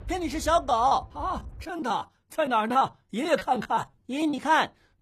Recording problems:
rain or running water; noticeable; until 1.5 s; 15 dB below the speech
choppy; very; 10% of the speech affected

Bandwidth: 14.5 kHz